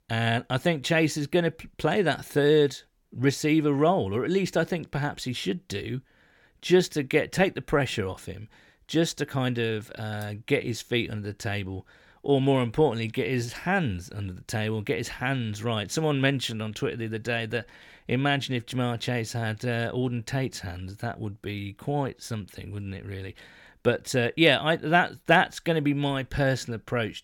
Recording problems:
none

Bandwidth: 17 kHz